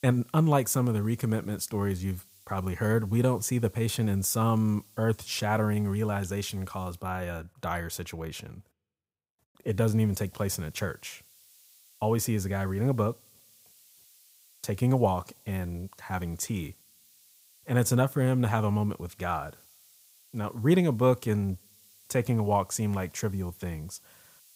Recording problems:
hiss; faint; until 7 s and from 9.5 s on; 25 dB below the speech

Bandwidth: 15.5 kHz